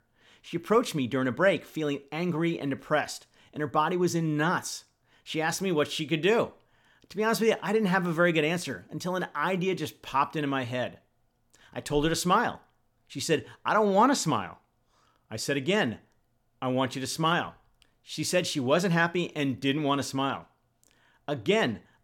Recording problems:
none

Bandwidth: 17.5 kHz